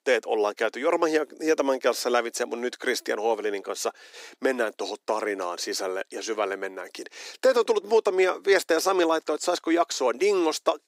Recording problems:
thin; very; fading below 300 Hz

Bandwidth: 15.5 kHz